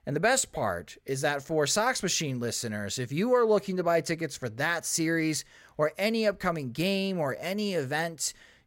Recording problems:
none

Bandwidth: 16 kHz